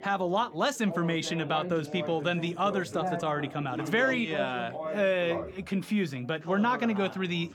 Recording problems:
background chatter; loud; throughout; 4 voices, 8 dB below the speech

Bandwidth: 18 kHz